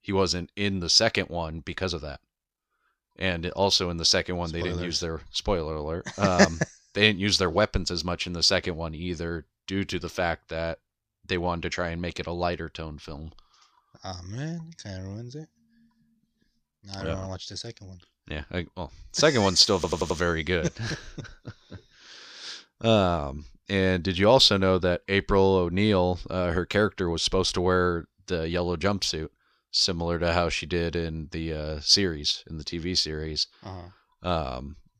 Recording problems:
audio stuttering; at 20 s

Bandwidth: 14.5 kHz